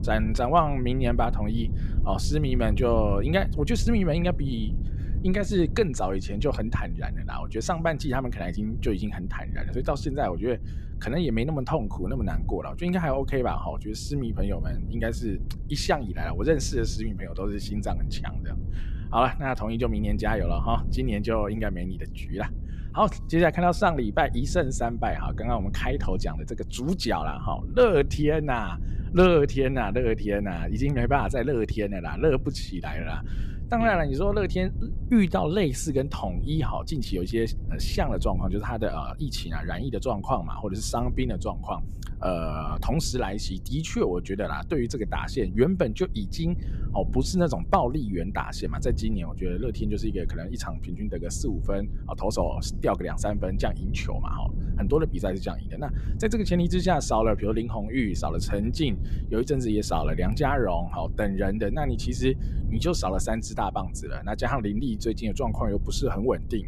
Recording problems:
low rumble; noticeable; throughout; 20 dB below the speech

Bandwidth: 14.5 kHz